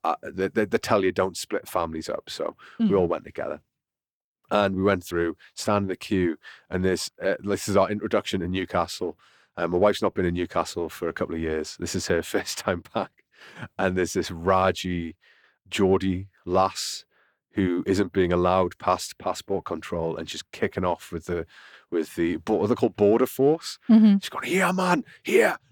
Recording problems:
none

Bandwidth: 18.5 kHz